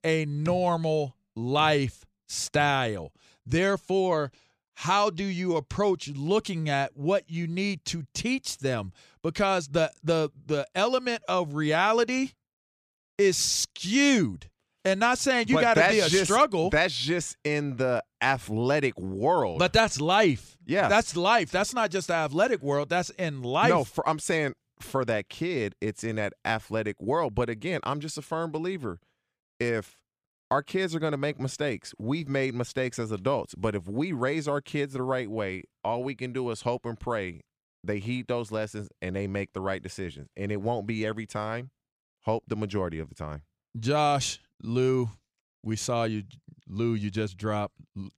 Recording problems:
none

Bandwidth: 14.5 kHz